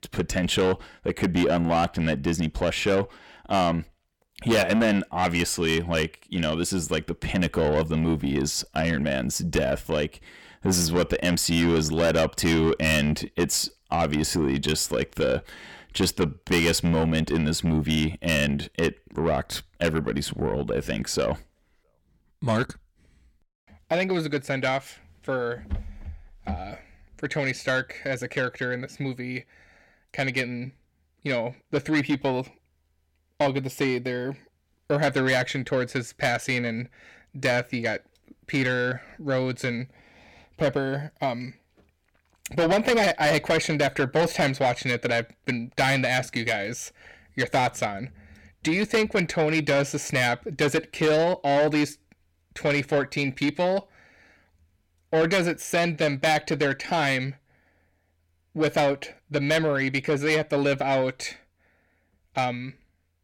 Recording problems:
distortion; heavy; 7 dB below the speech

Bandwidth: 17.5 kHz